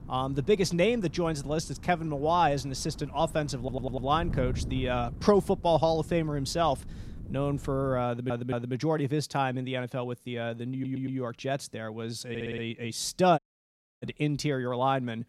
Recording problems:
wind noise on the microphone; occasional gusts; until 8 s; 20 dB below the speech
audio stuttering; 4 times, first at 3.5 s
audio cutting out; at 13 s for 0.5 s

